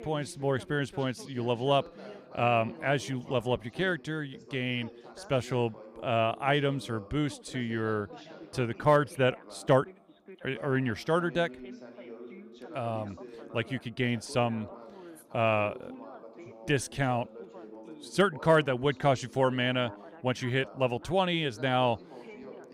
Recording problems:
background chatter; noticeable; throughout; 2 voices, 20 dB below the speech

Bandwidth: 15.5 kHz